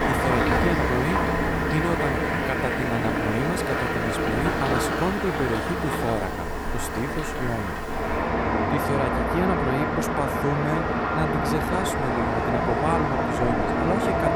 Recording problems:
traffic noise; very loud; throughout; 4 dB above the speech

